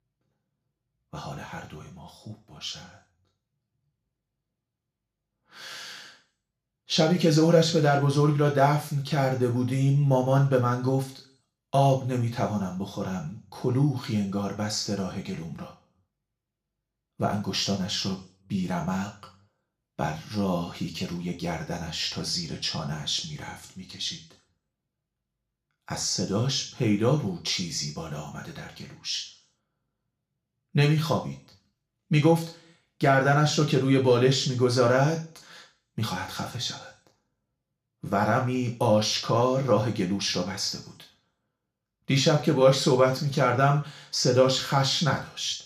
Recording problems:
room echo; slight; dies away in 0.4 s
off-mic speech; somewhat distant

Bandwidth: 15 kHz